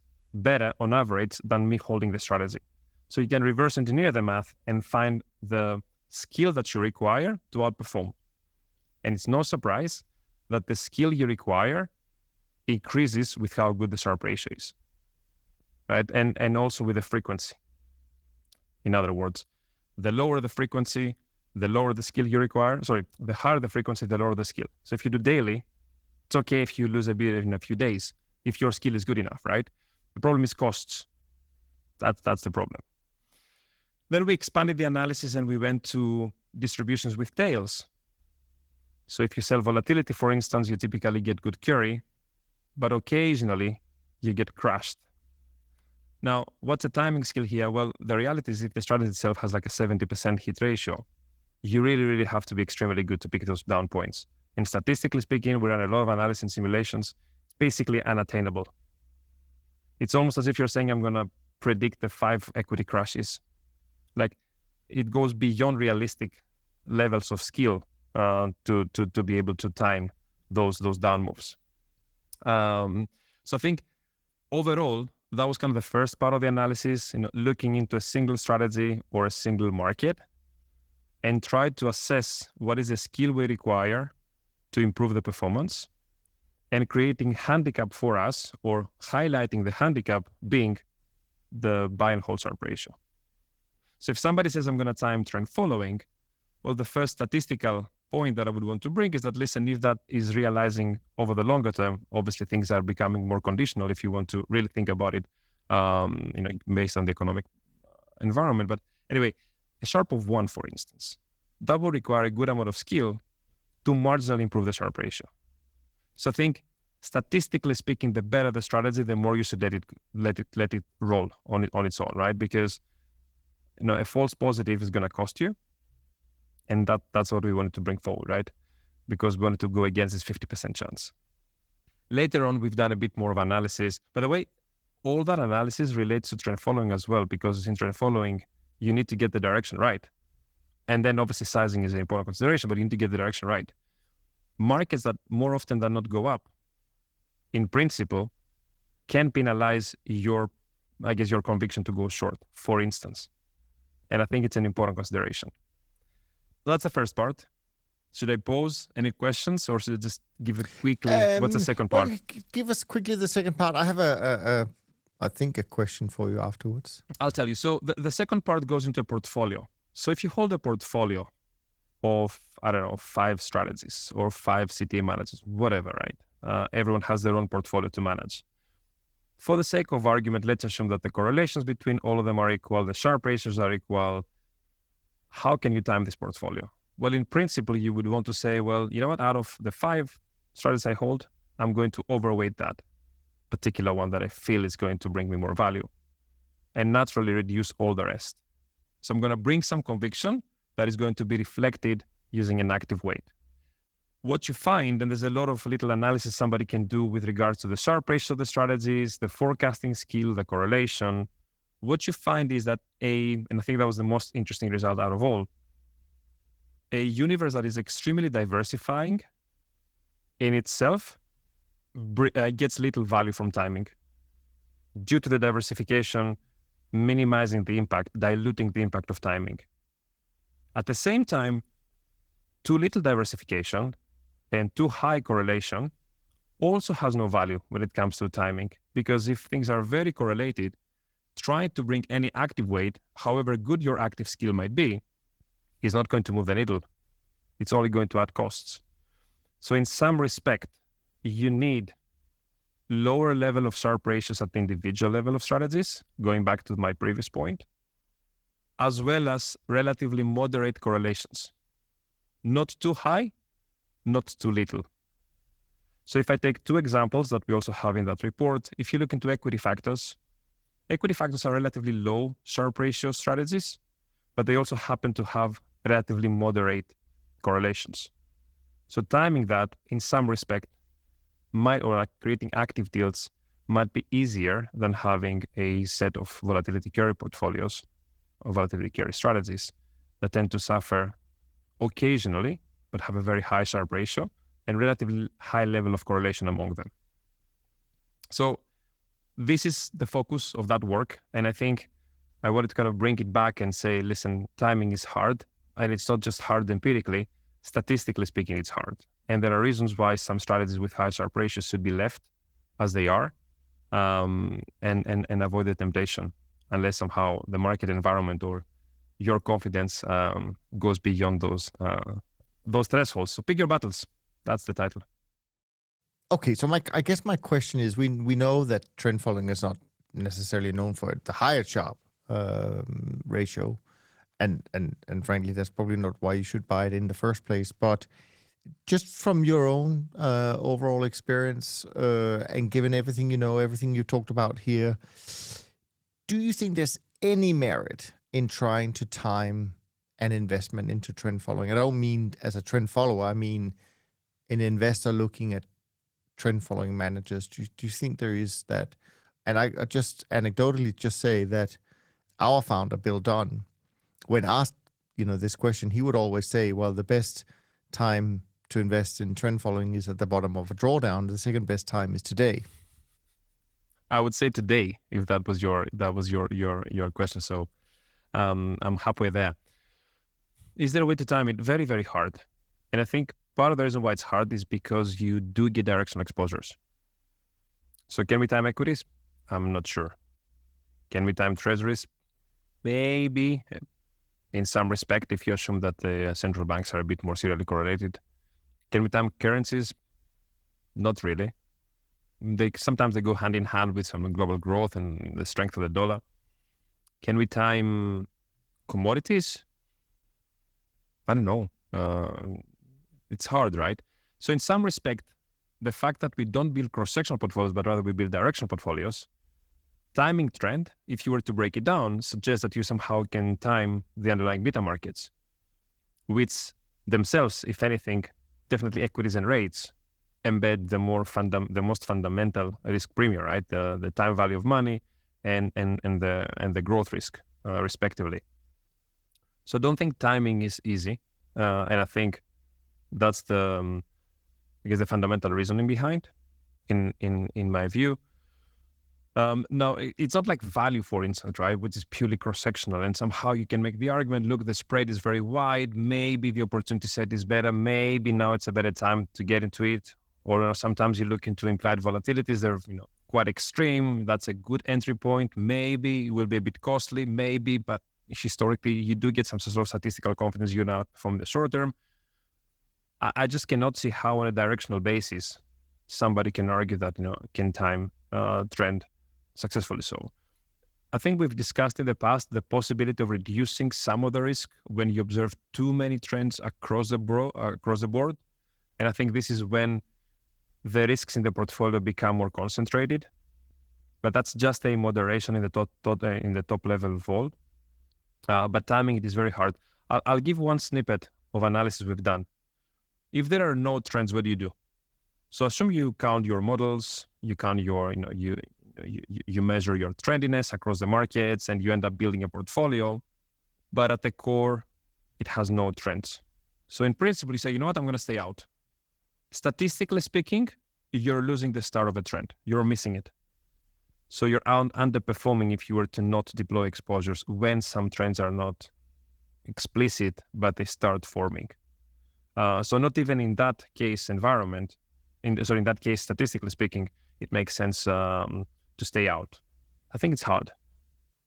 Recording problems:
garbled, watery; slightly

